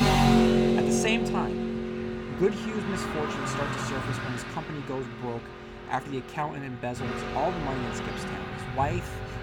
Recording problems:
traffic noise; very loud; throughout; 4 dB above the speech

